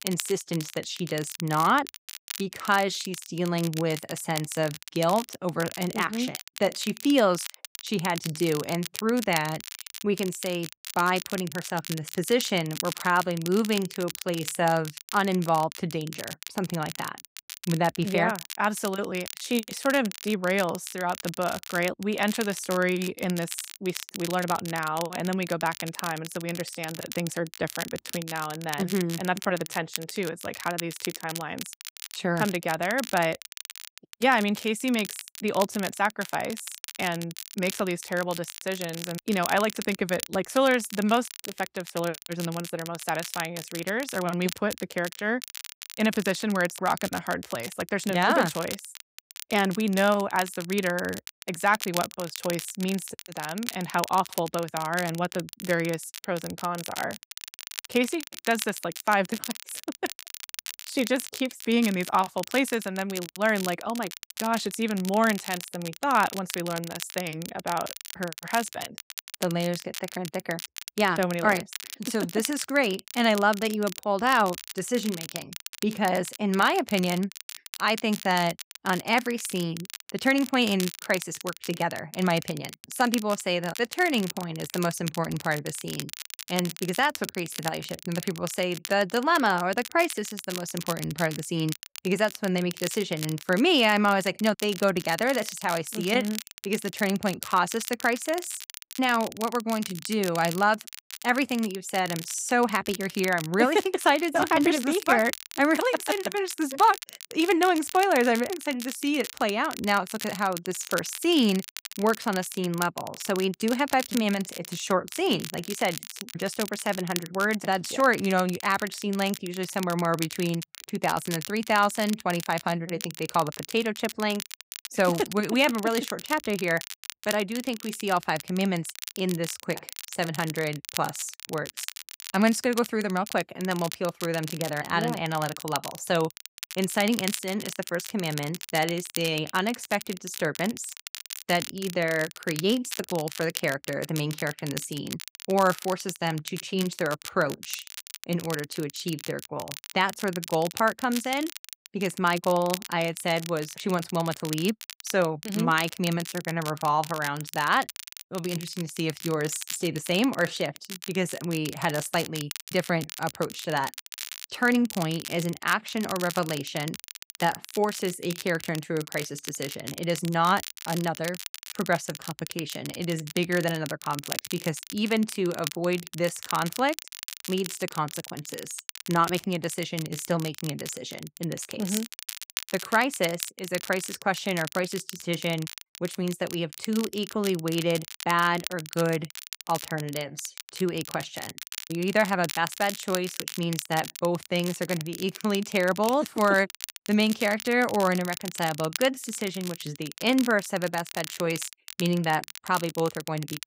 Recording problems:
crackle, like an old record; noticeable; 10 dB below the speech

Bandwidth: 15.5 kHz